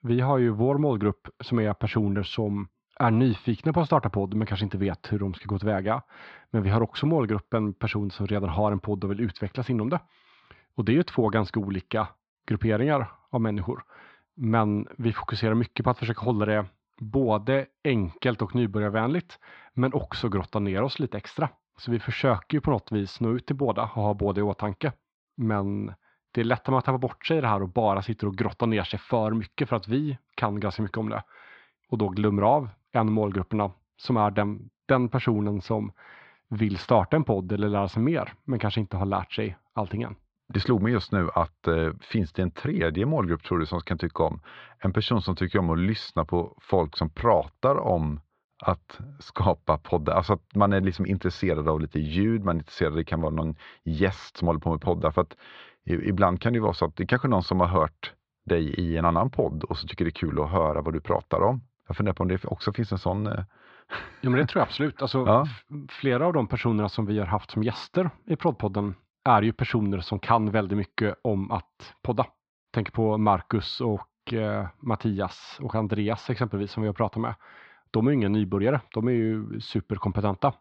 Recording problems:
muffled; slightly; fading above 4 kHz

